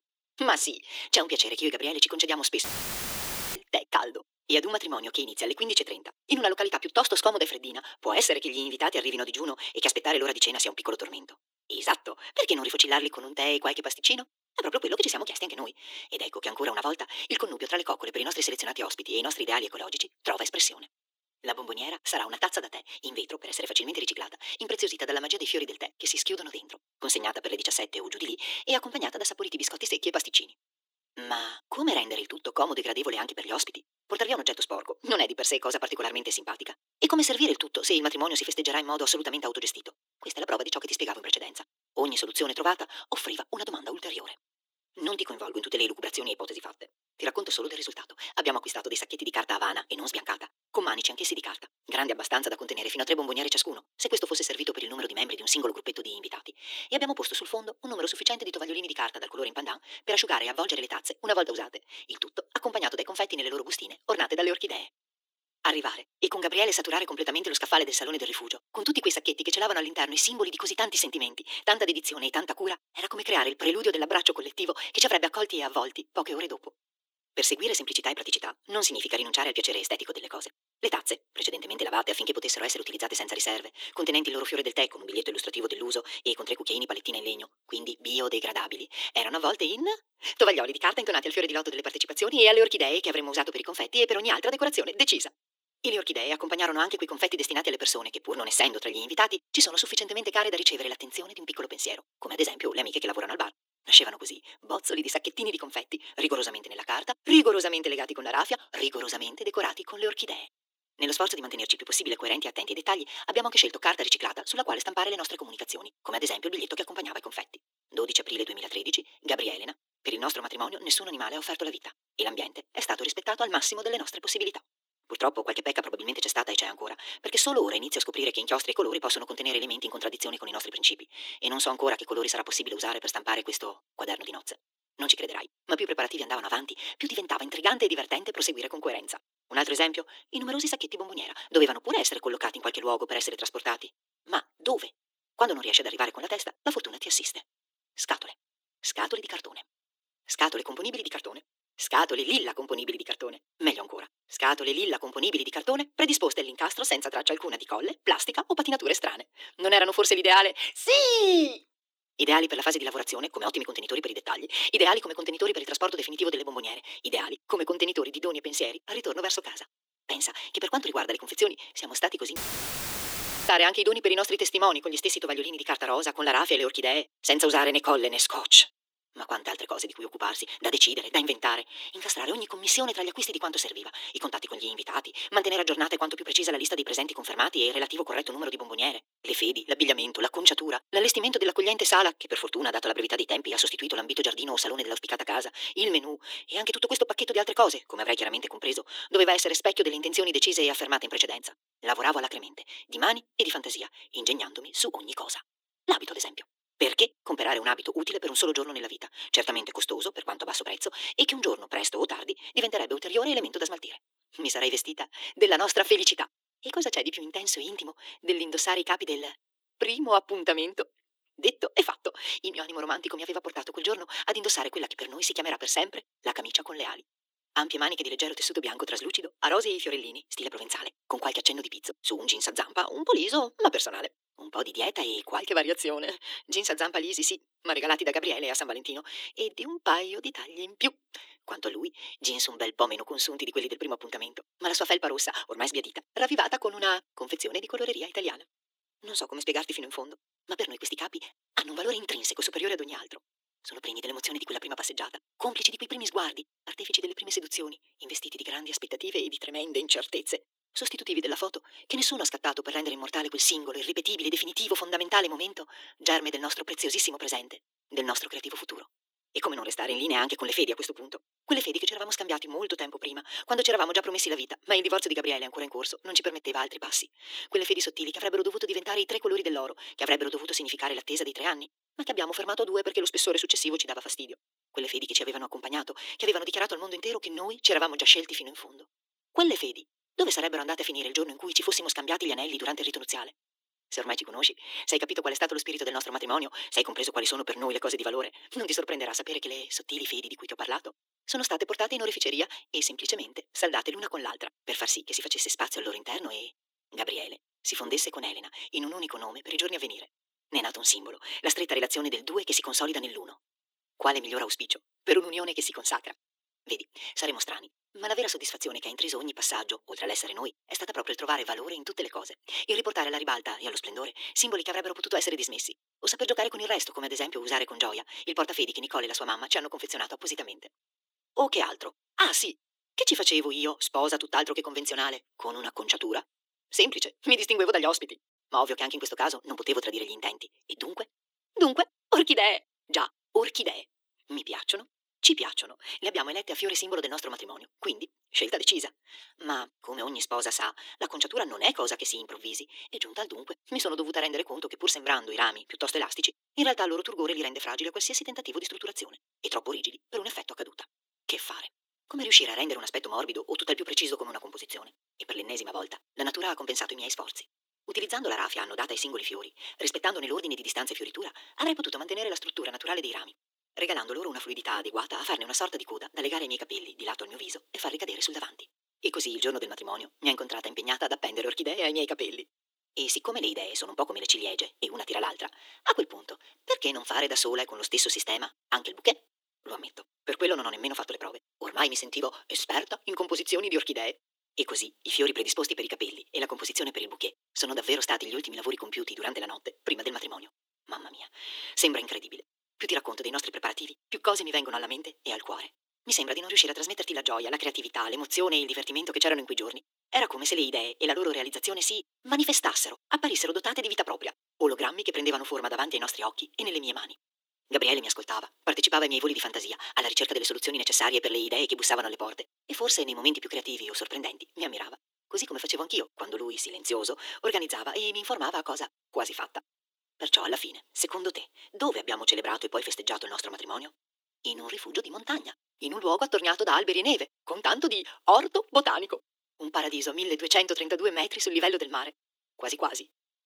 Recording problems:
thin; very; fading below 300 Hz
wrong speed, natural pitch; too fast; 1.7 times normal speed
audio cutting out; filled with static; at 2.5 s for 1 s and at 2:52 for 1 s

